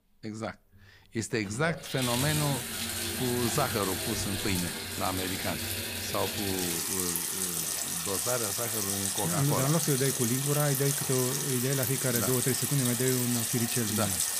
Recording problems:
household noises; very loud; throughout; 2 dB above the speech

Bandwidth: 15 kHz